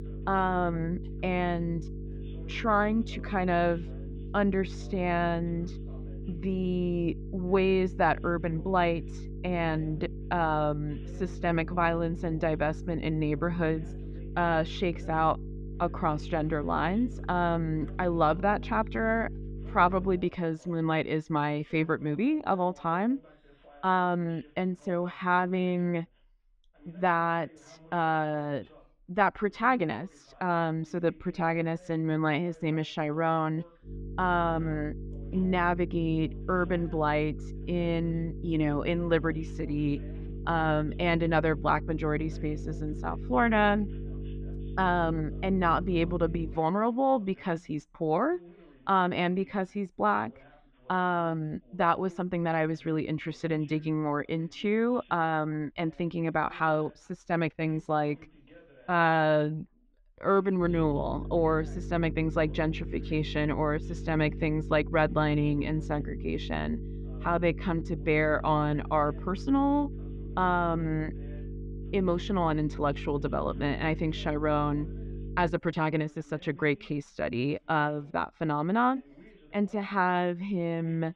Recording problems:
muffled; very; fading above 3 kHz
electrical hum; noticeable; until 20 s, from 34 to 47 s and from 1:01 to 1:16; 50 Hz, 20 dB below the speech
voice in the background; faint; throughout; 25 dB below the speech

